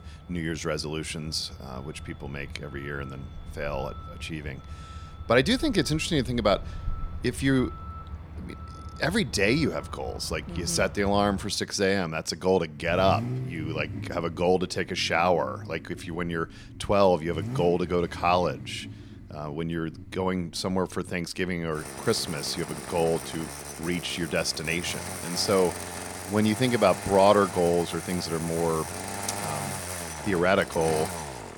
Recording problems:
traffic noise; noticeable; throughout; 10 dB below the speech

